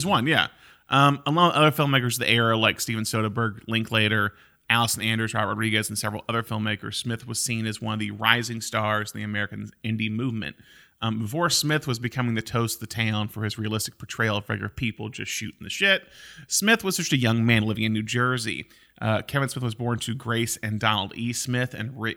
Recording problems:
abrupt cut into speech; at the start

